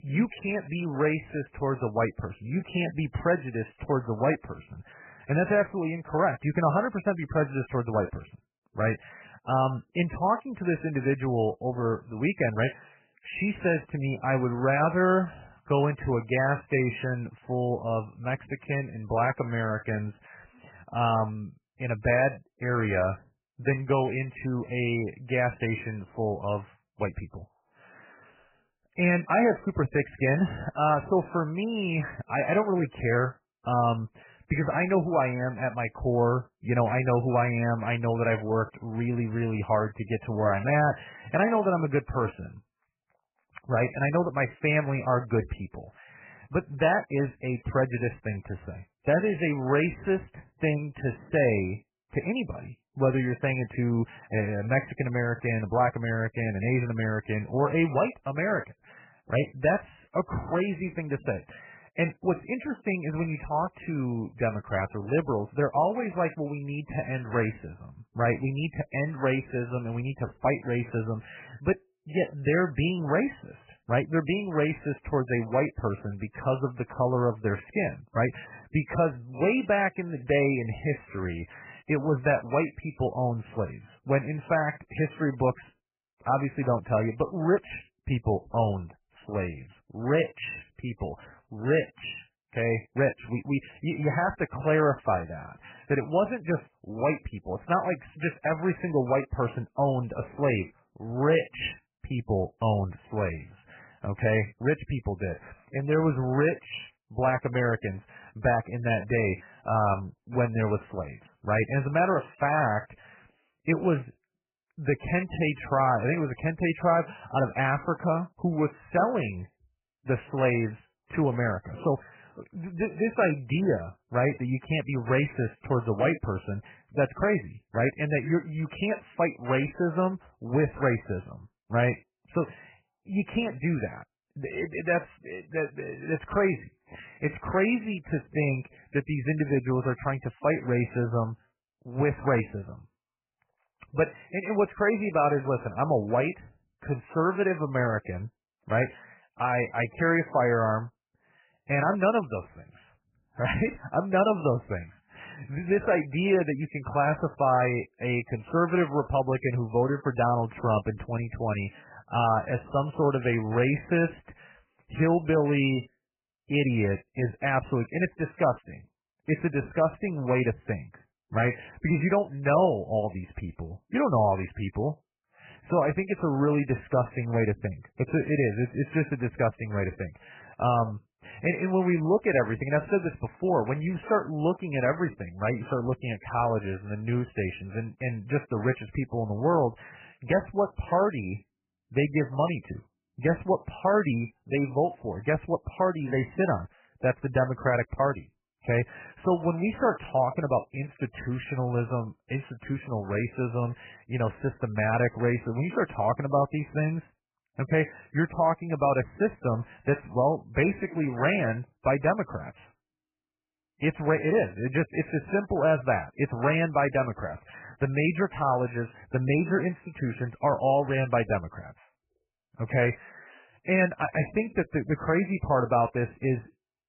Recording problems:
garbled, watery; badly; nothing above 3 kHz

